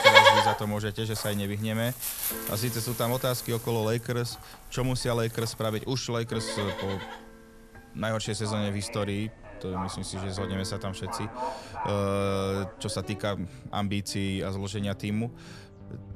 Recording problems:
animal sounds; very loud; throughout; 2 dB above the speech
background music; noticeable; throughout; 15 dB below the speech

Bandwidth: 13.5 kHz